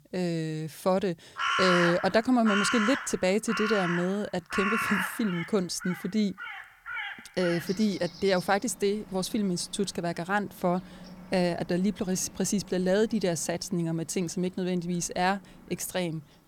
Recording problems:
animal sounds; loud; throughout; 4 dB below the speech

